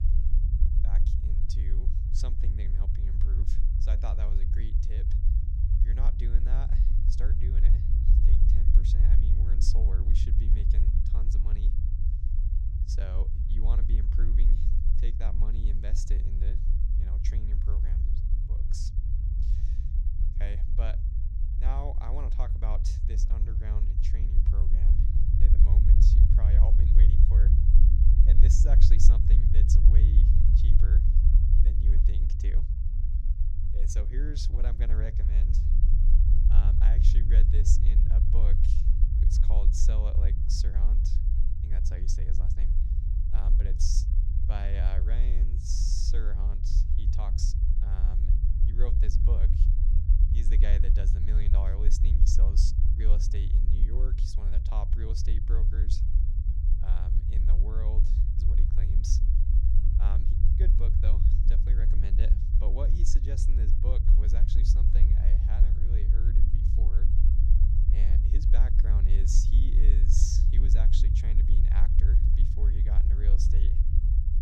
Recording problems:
low rumble; loud; throughout; 1 dB below the speech

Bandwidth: 16 kHz